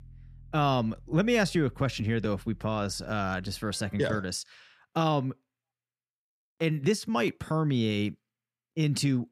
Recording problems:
background music; faint; until 4 s; 25 dB below the speech

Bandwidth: 14.5 kHz